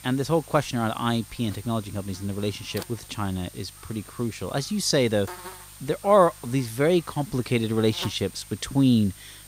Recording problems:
electrical hum; noticeable; throughout; 50 Hz, 20 dB below the speech

